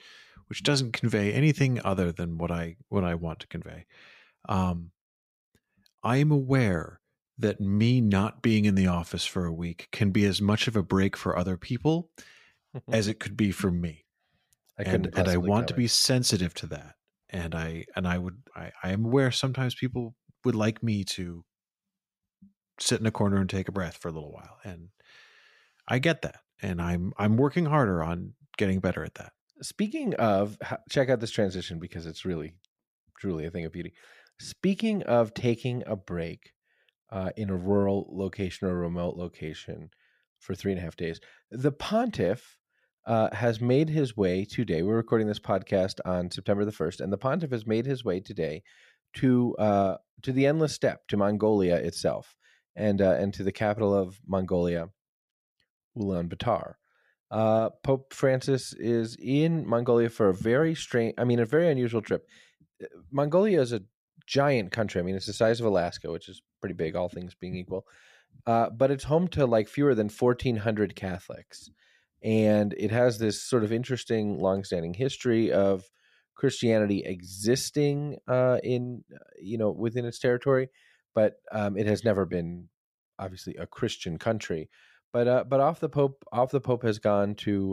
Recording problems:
abrupt cut into speech; at the end

